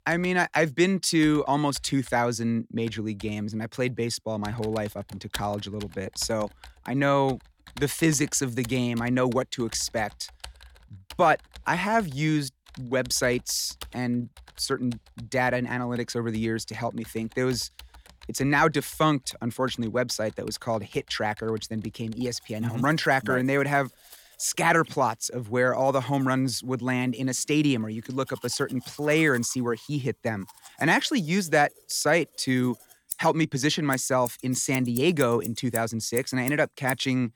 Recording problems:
household noises; noticeable; throughout; 20 dB below the speech

